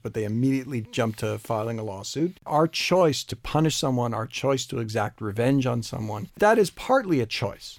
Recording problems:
none

